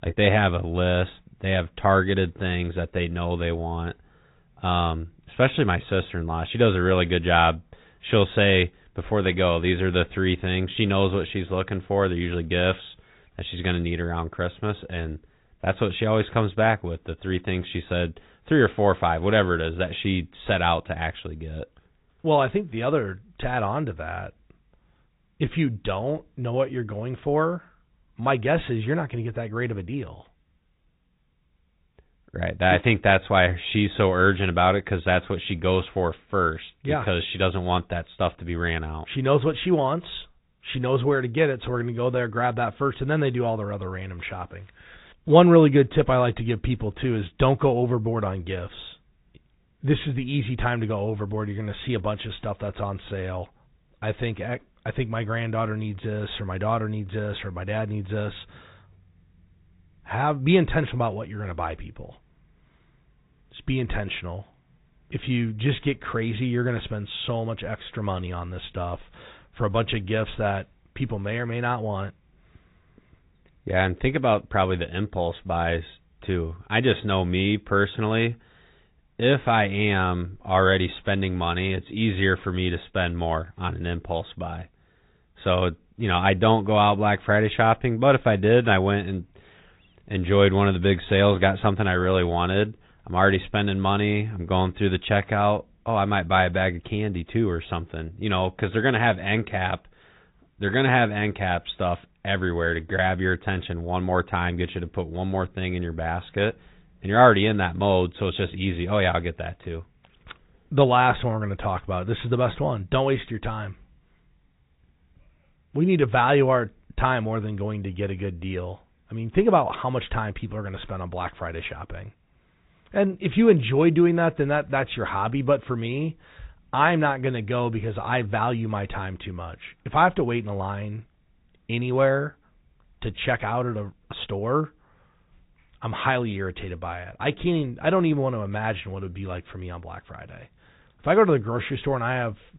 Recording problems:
high frequencies cut off; severe; nothing above 4 kHz
garbled, watery; slightly

